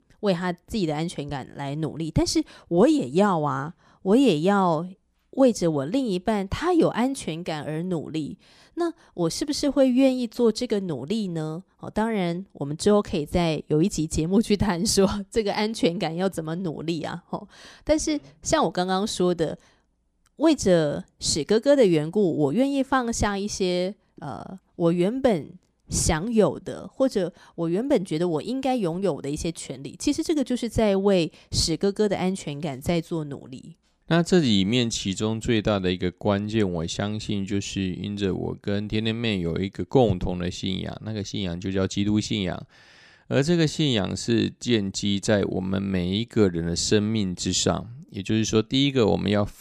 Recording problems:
none

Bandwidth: 14.5 kHz